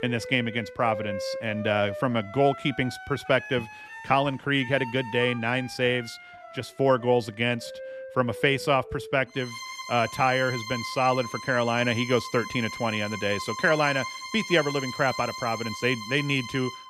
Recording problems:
background music; noticeable; throughout; 10 dB below the speech

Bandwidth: 14 kHz